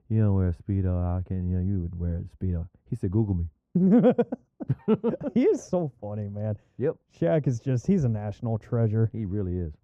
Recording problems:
muffled; very; fading above 2 kHz

